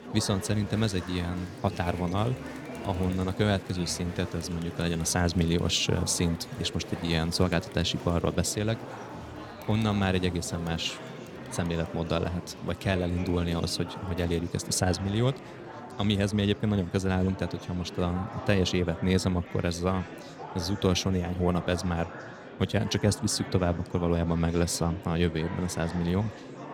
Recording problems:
murmuring crowd; noticeable; throughout; 10 dB below the speech

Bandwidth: 17.5 kHz